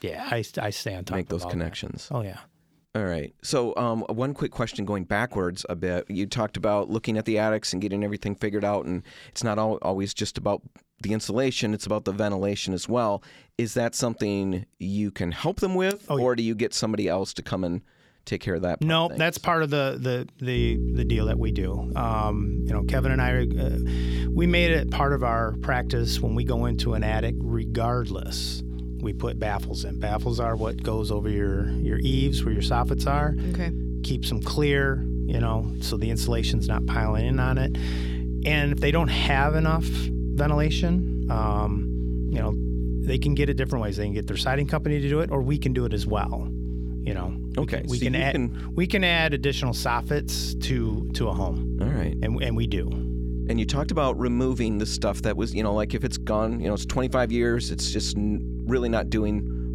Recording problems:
electrical hum; noticeable; from 21 s on; 60 Hz, 10 dB below the speech

